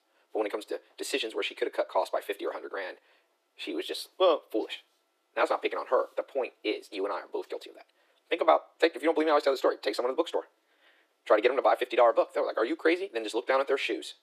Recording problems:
thin; very; fading below 300 Hz
wrong speed, natural pitch; too fast; 1.5 times normal speed

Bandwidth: 14.5 kHz